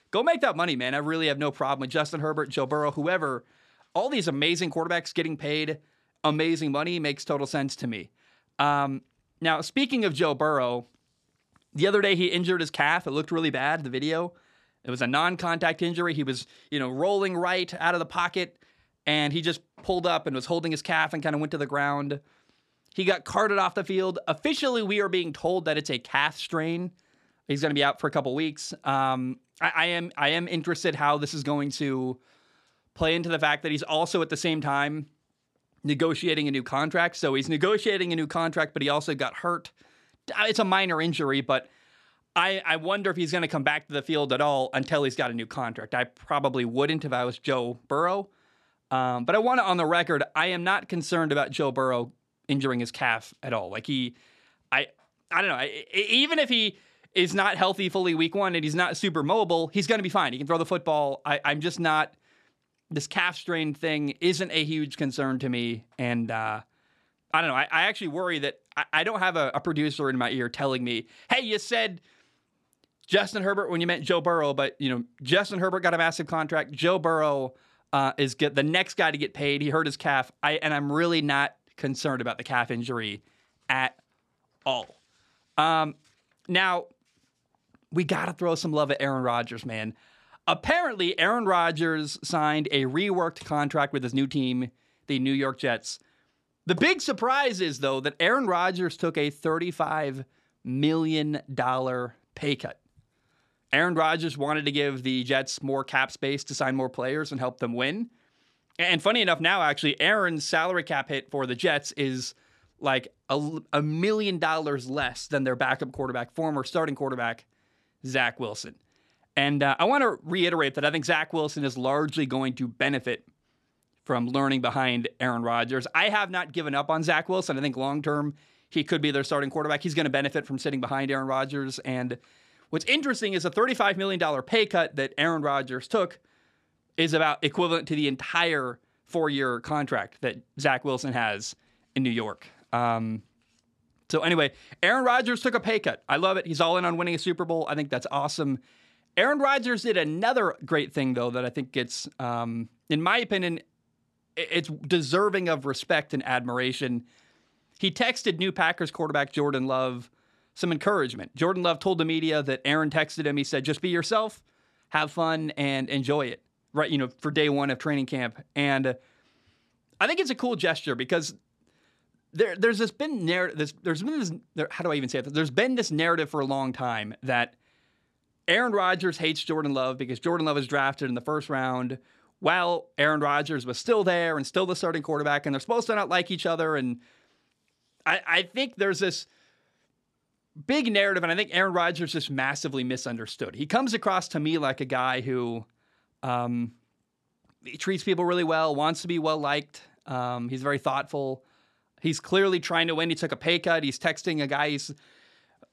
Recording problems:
none

